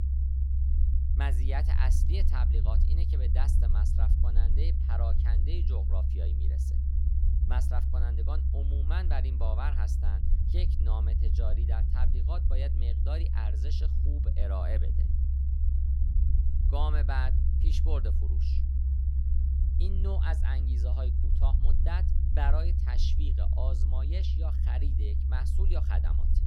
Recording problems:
low rumble; loud; throughout; 4 dB below the speech

